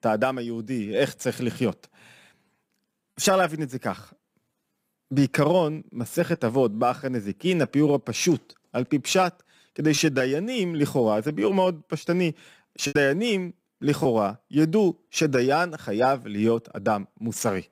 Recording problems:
choppy; occasionally; from 13 to 14 s; 3% of the speech affected

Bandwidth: 15.5 kHz